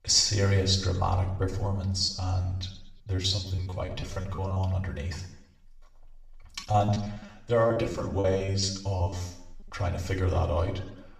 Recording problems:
off-mic speech; far
room echo; slight; dies away in 0.7 s
choppy; very; from 2 to 4.5 s and from 6.5 to 9 s; 18% of the speech affected

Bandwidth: 15 kHz